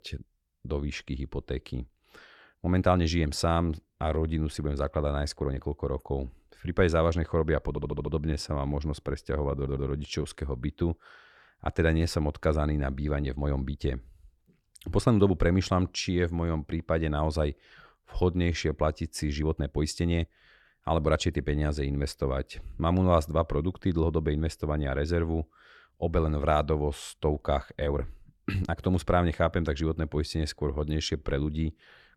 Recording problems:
uneven, jittery; strongly; from 2.5 to 31 s
audio stuttering; at 7.5 s and at 9.5 s

